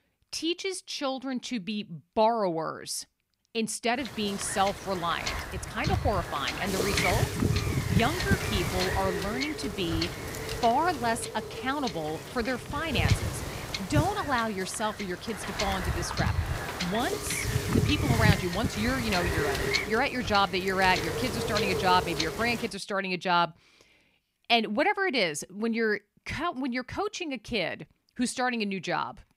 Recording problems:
wind noise on the microphone; heavy; from 4 to 23 s; 4 dB below the speech

